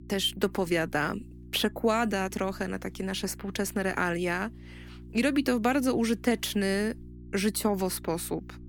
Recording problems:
electrical hum; faint; throughout; 60 Hz, 25 dB below the speech

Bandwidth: 18 kHz